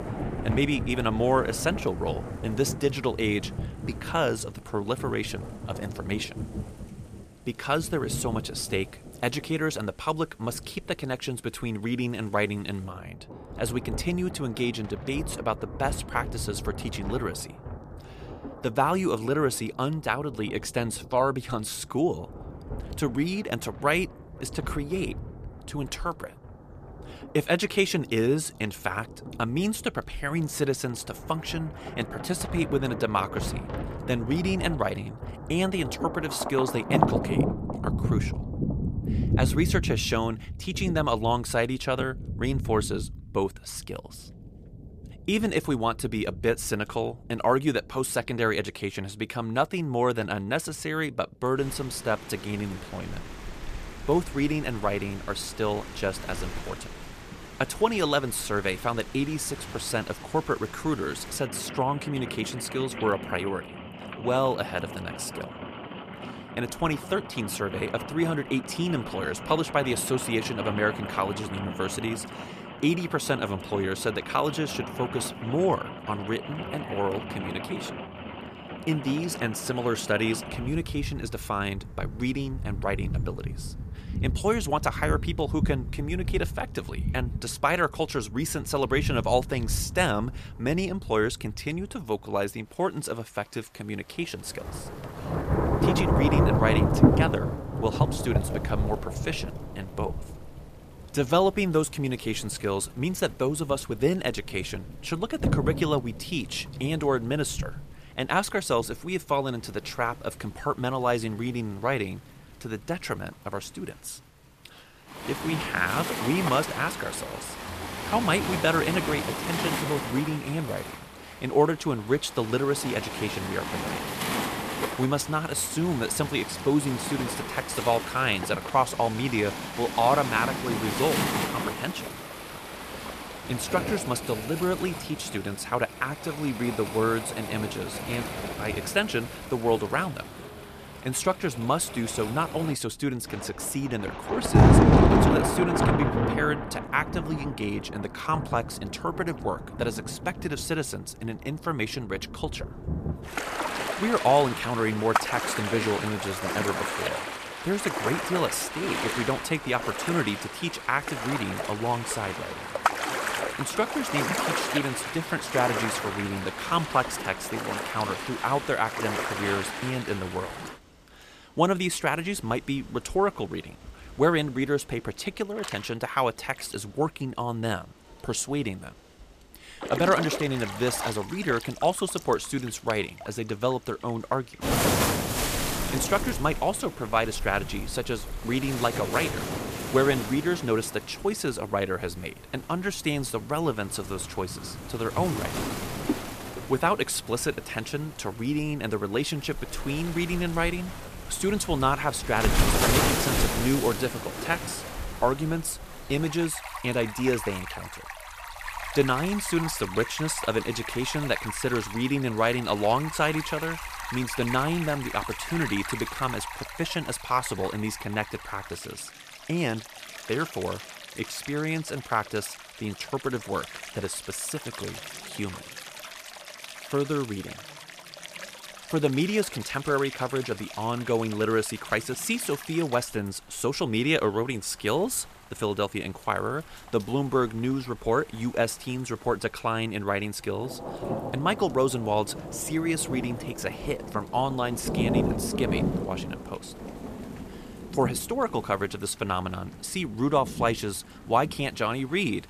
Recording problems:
rain or running water; loud; throughout; 4 dB below the speech

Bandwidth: 14.5 kHz